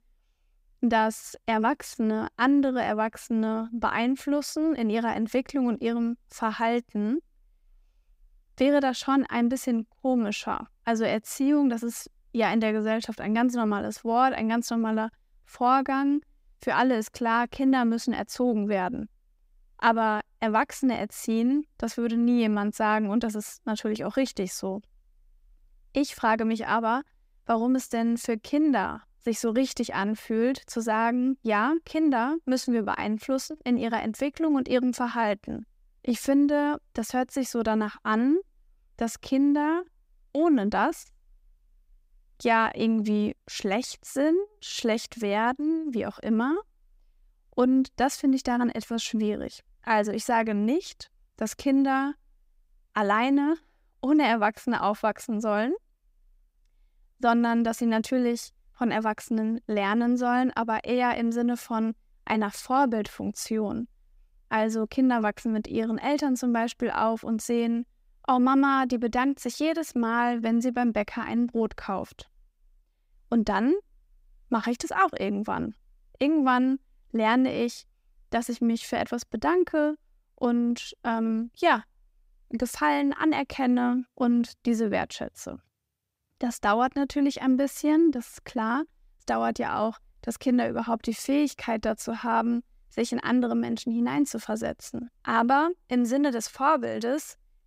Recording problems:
none

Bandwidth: 15.5 kHz